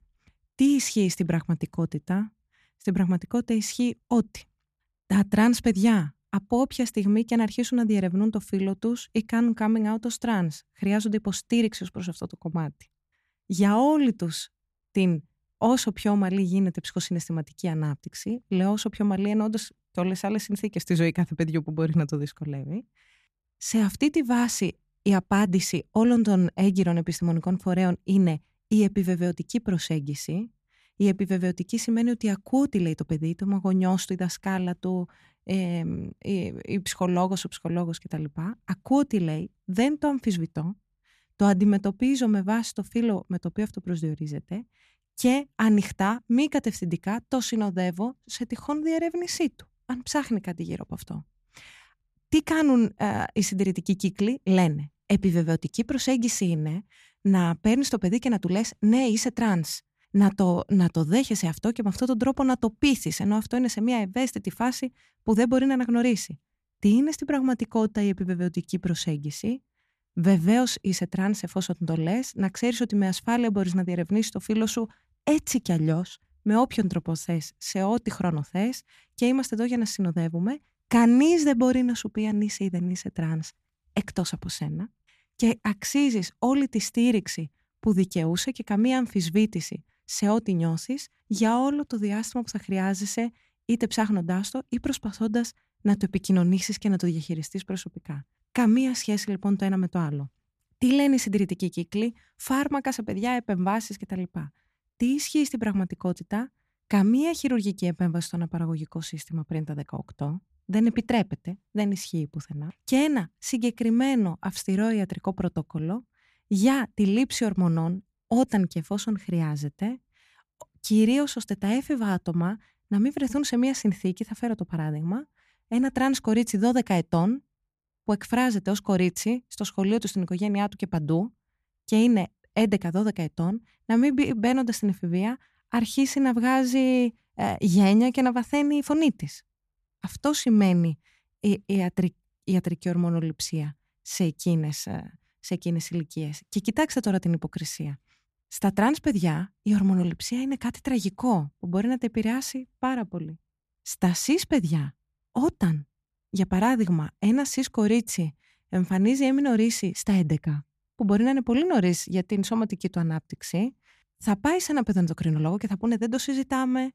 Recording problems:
none

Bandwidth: 14.5 kHz